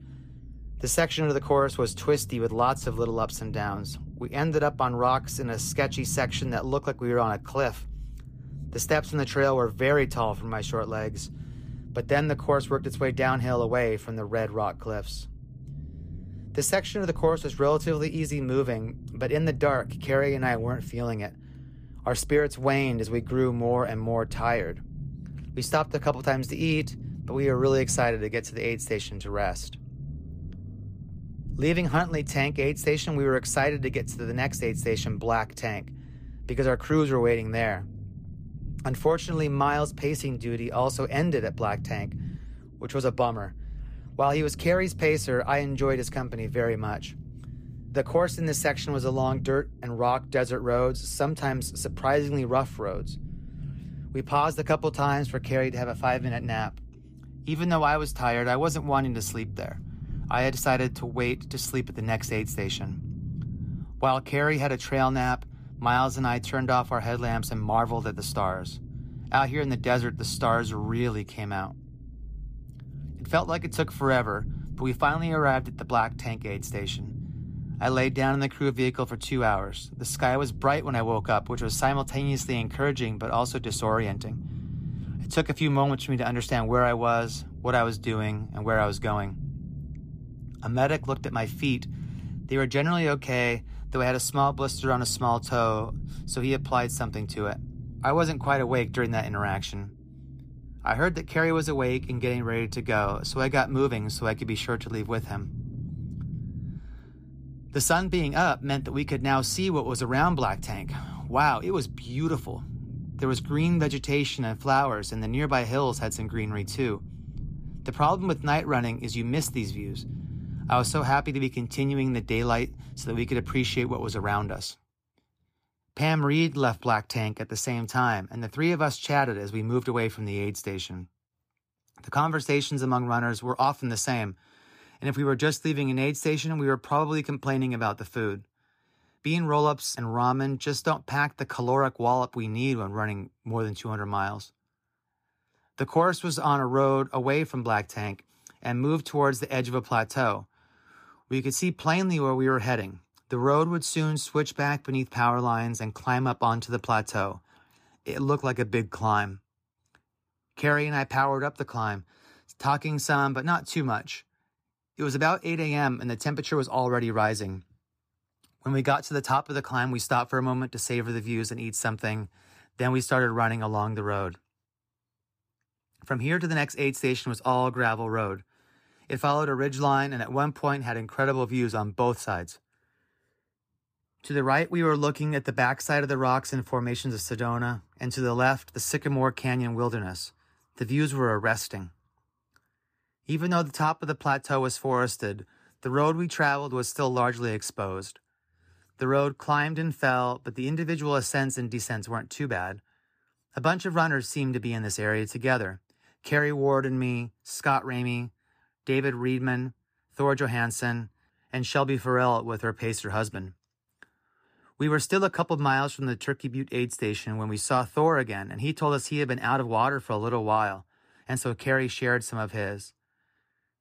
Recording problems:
low rumble; faint; until 2:05; 25 dB below the speech

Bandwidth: 14.5 kHz